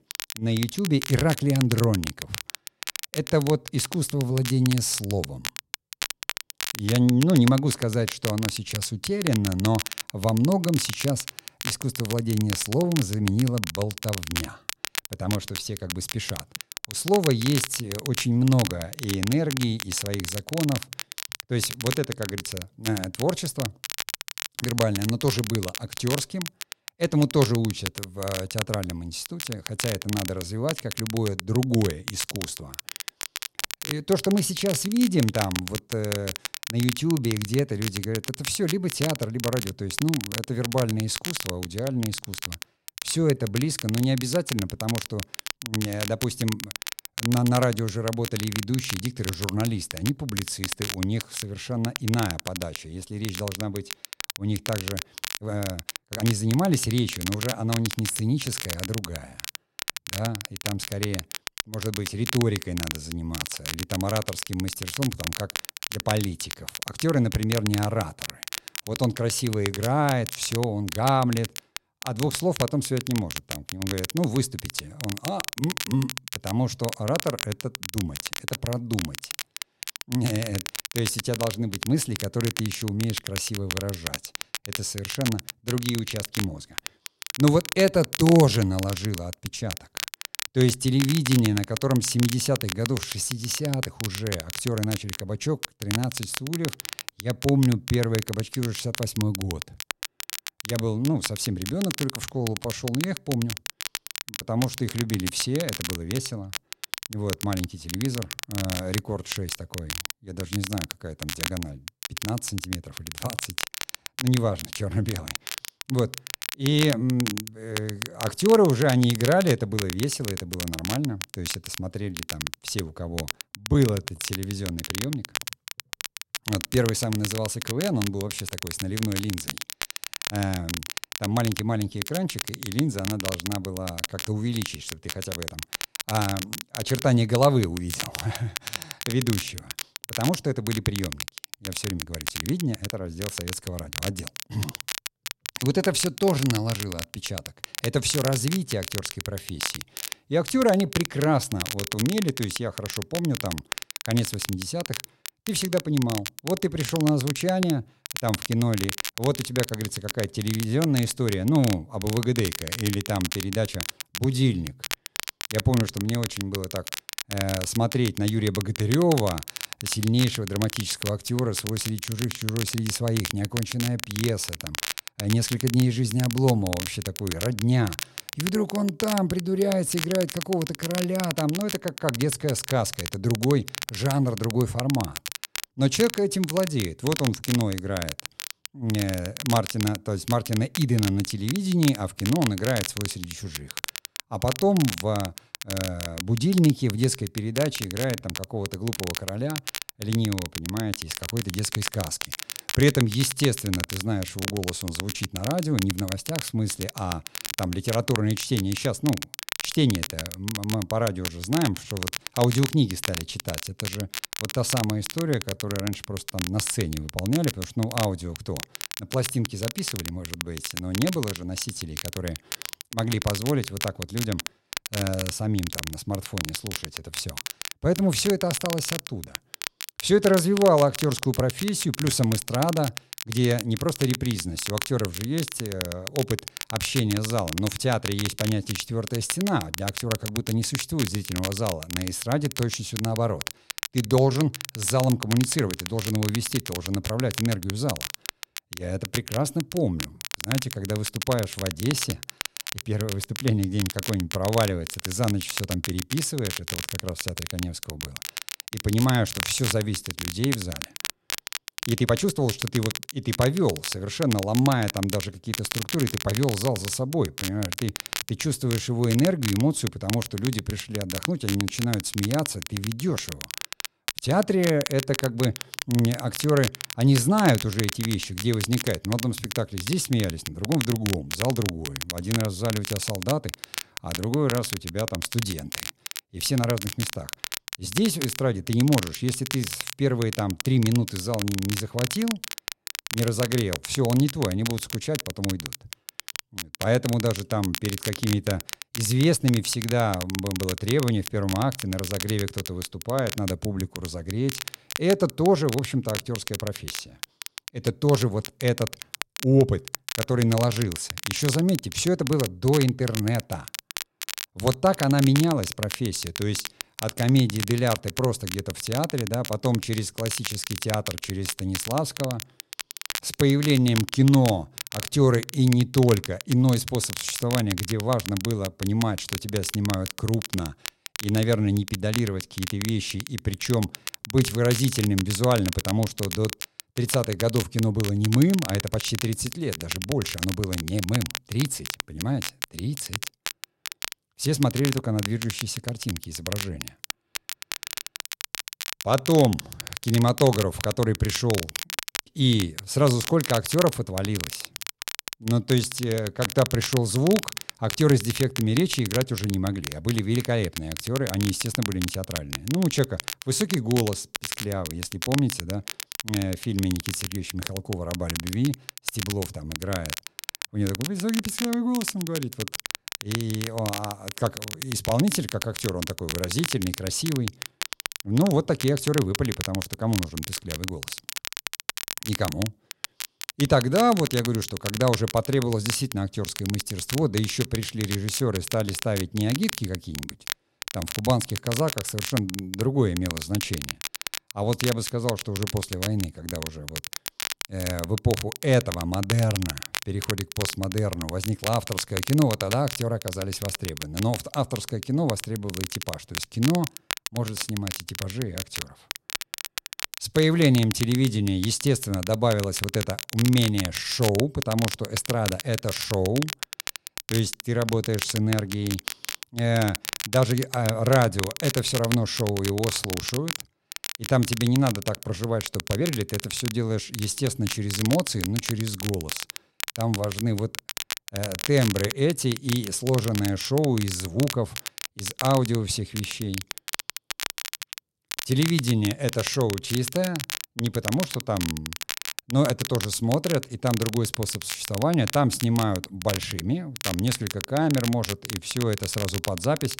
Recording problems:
crackle, like an old record; loud; 7 dB below the speech
uneven, jittery; strongly; from 43 s to 7:06

